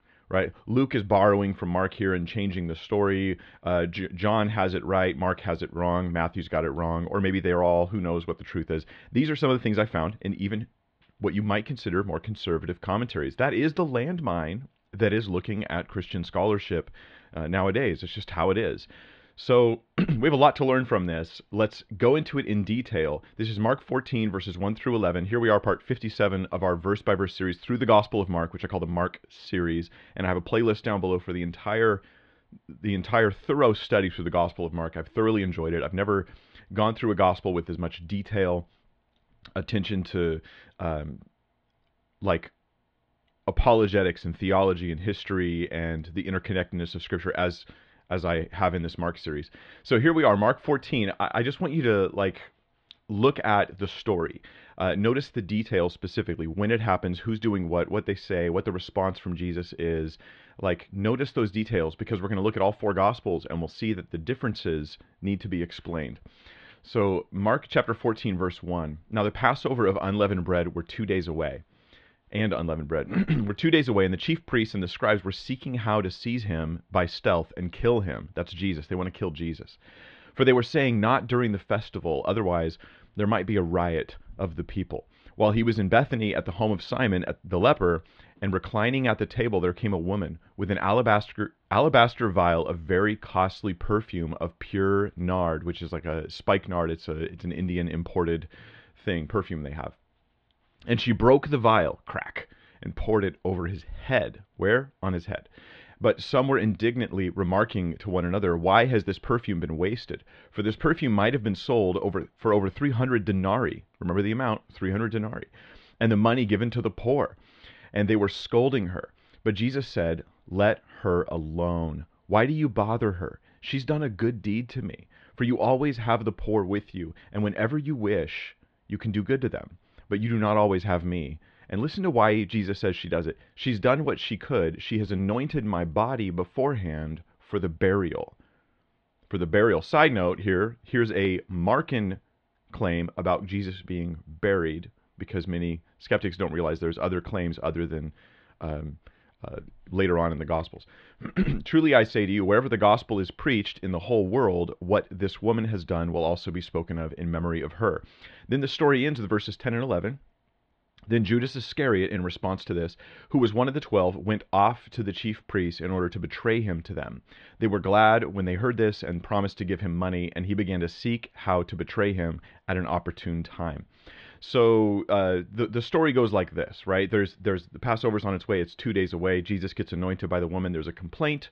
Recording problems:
muffled; slightly; fading above 4 kHz

